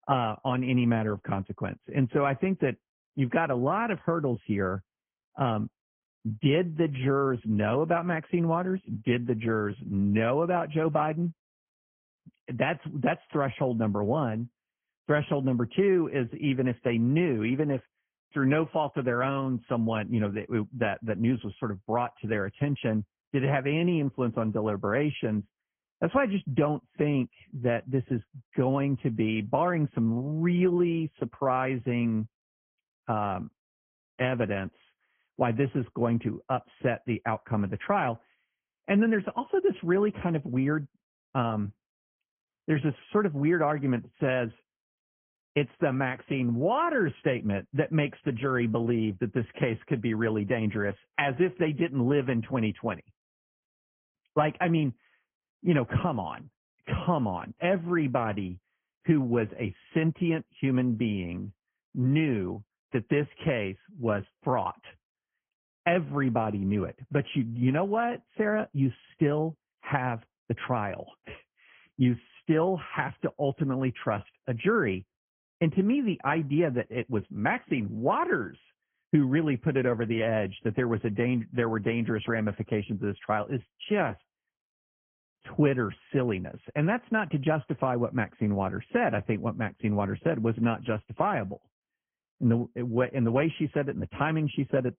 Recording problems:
high frequencies cut off; severe; nothing above 3.5 kHz
garbled, watery; slightly

